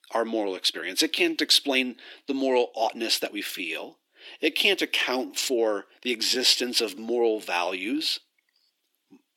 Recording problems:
thin; somewhat; fading below 300 Hz
uneven, jittery; strongly; from 0.5 to 8 s

